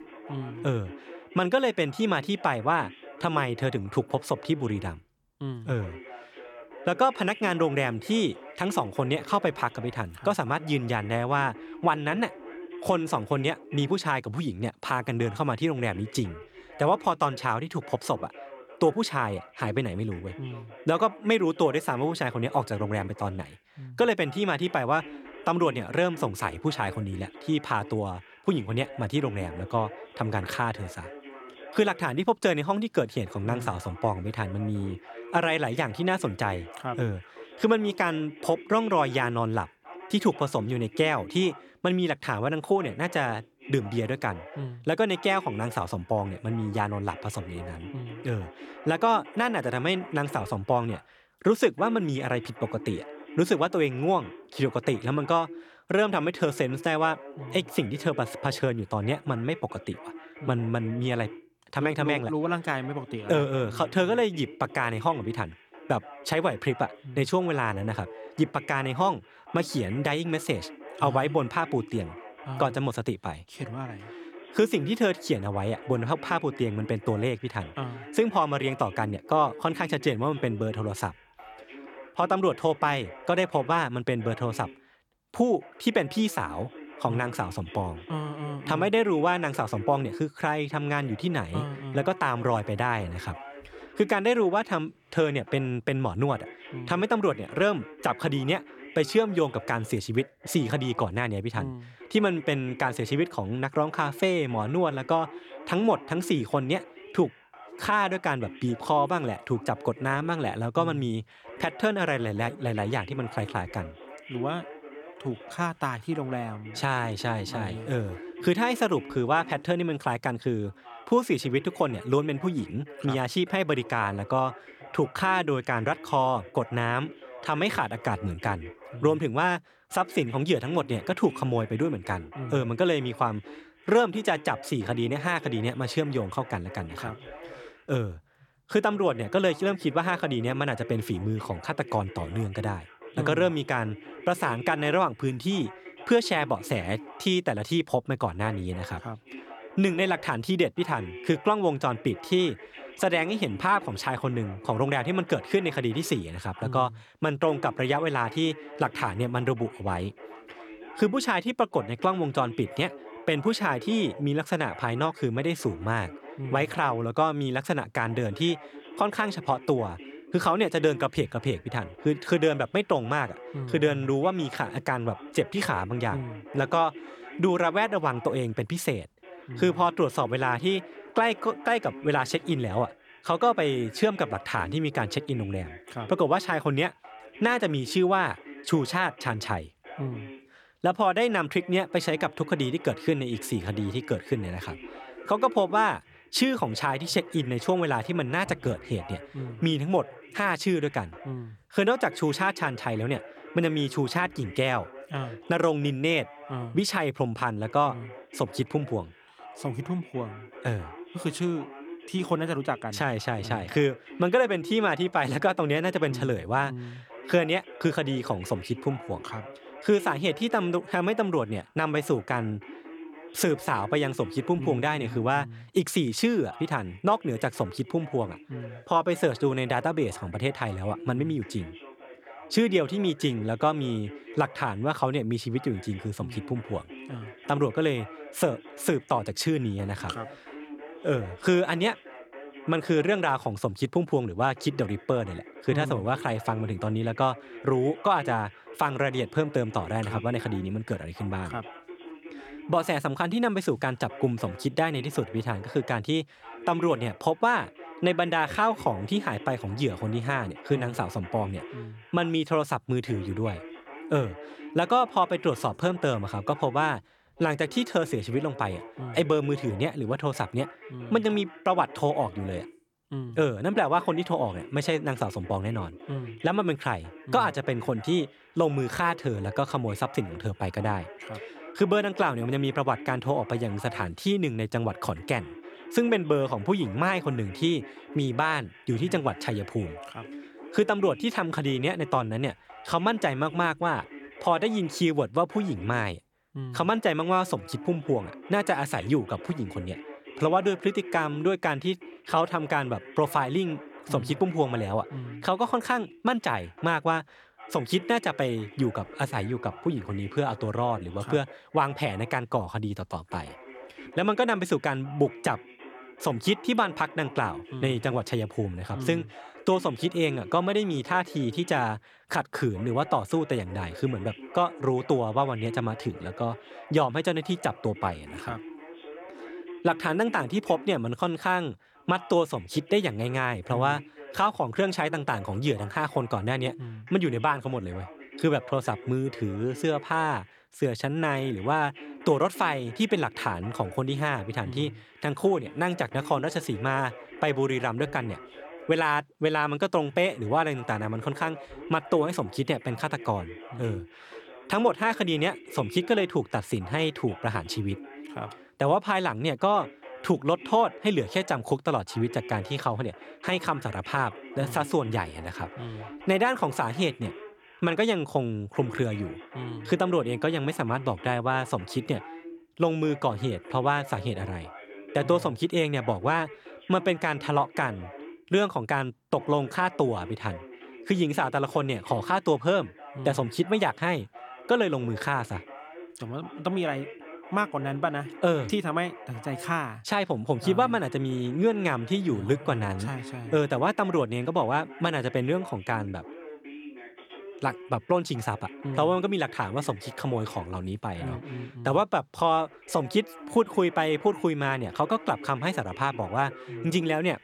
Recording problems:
voice in the background; noticeable; throughout; 15 dB below the speech

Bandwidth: 18 kHz